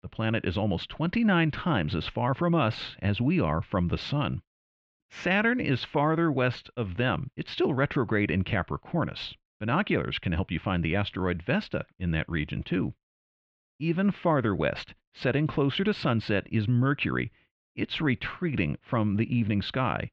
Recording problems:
muffled; slightly; fading above 3.5 kHz

